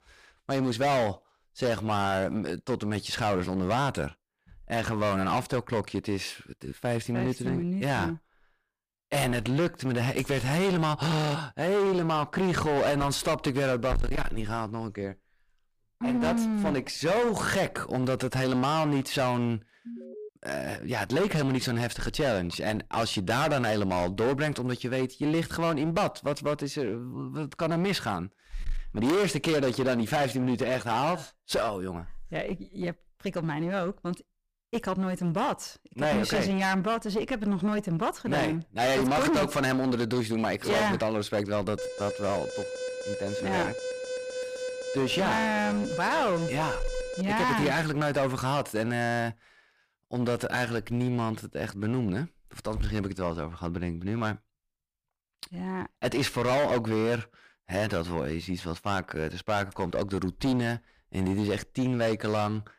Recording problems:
distortion; heavy; 15% of the sound clipped
alarm; faint; at 20 s; peak 15 dB below the speech
alarm; noticeable; from 42 to 47 s; peak 5 dB below the speech

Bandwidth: 15 kHz